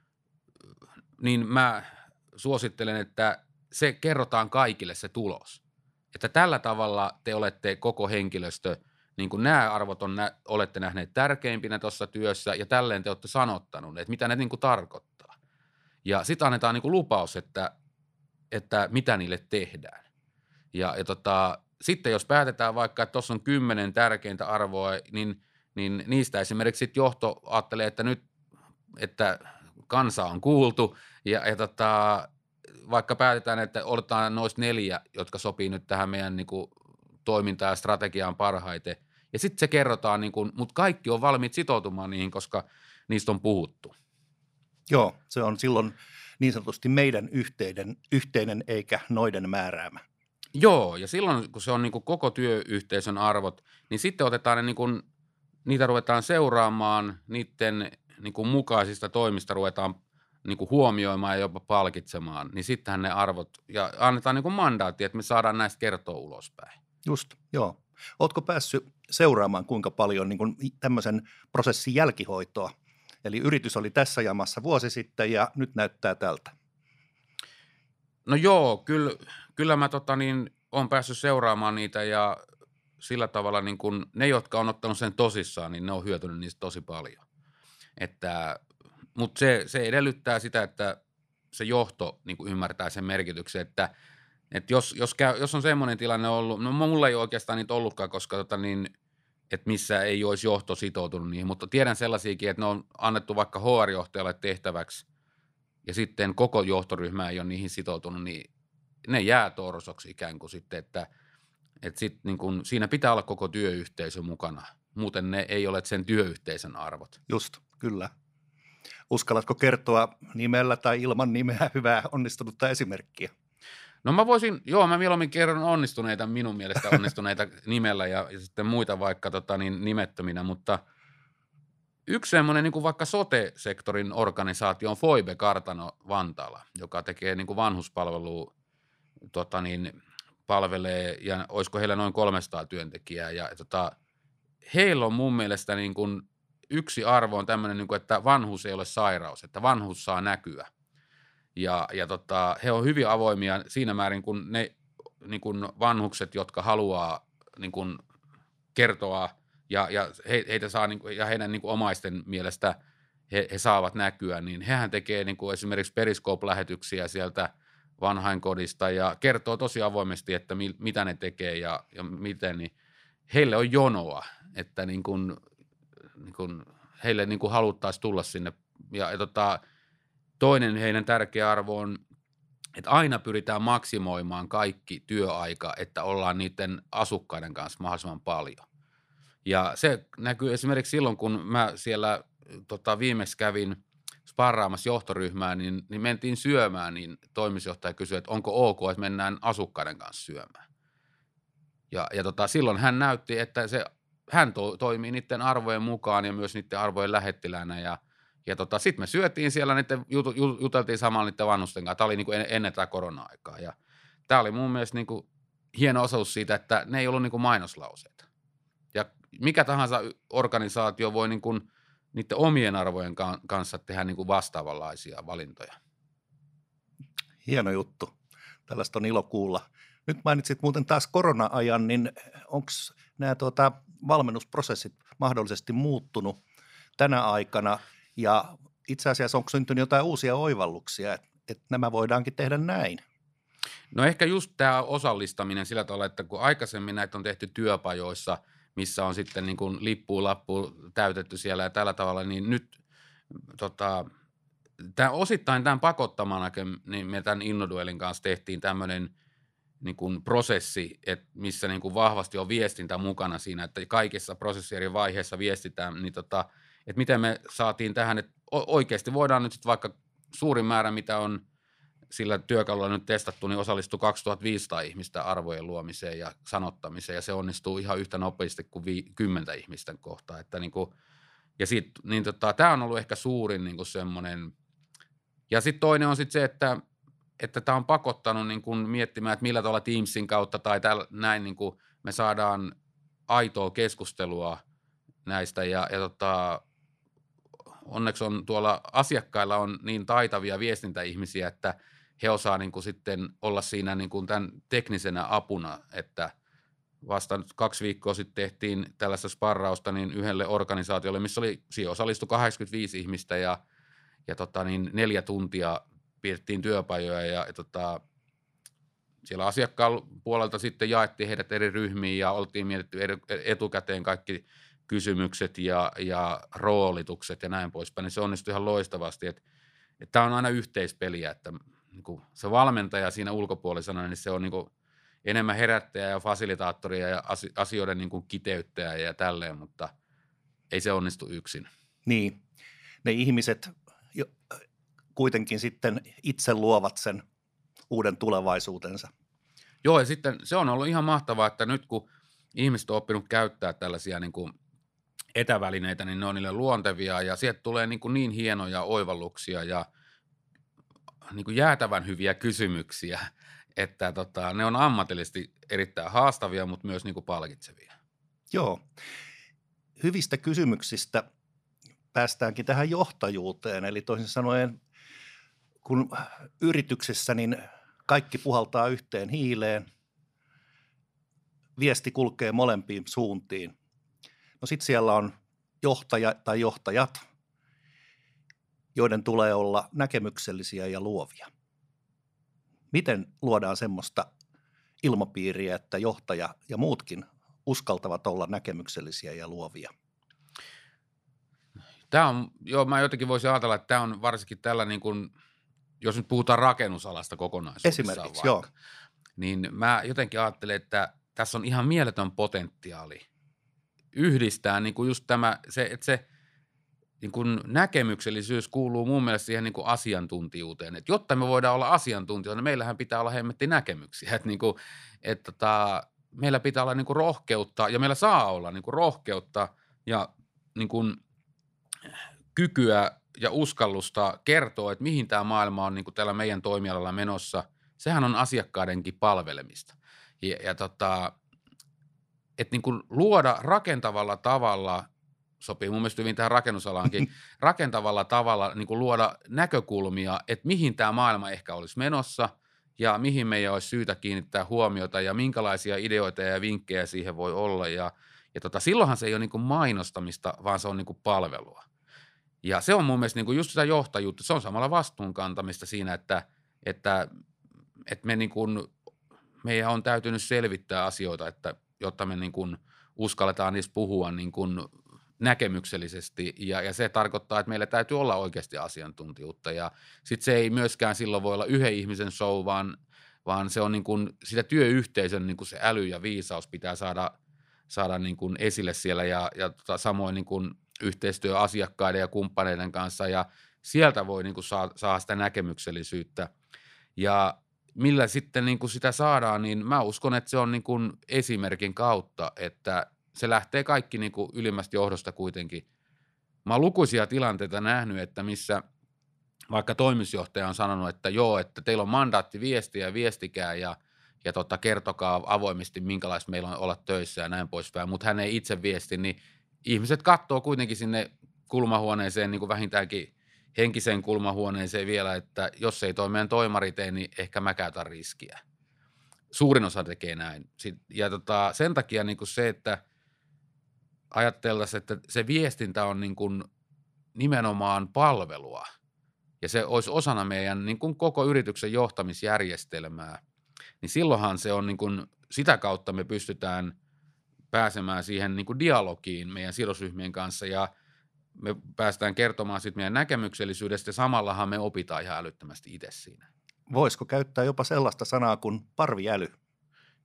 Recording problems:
none

